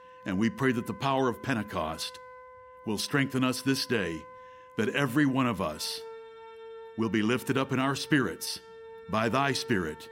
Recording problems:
background music; noticeable; throughout; 20 dB below the speech

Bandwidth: 16 kHz